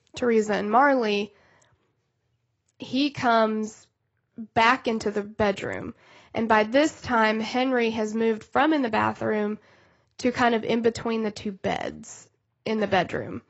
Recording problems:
garbled, watery; badly; nothing above 8 kHz

